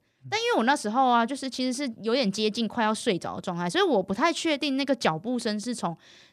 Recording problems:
none

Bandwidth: 14.5 kHz